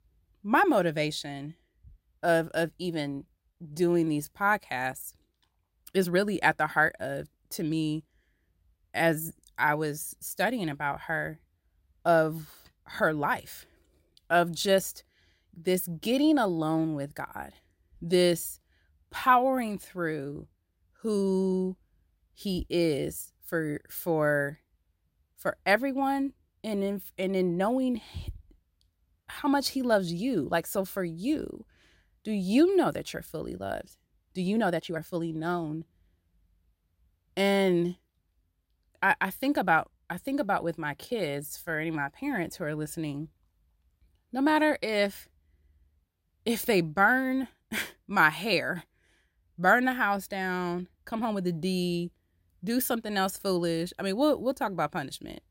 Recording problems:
uneven, jittery; strongly; from 3.5 to 51 s

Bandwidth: 16 kHz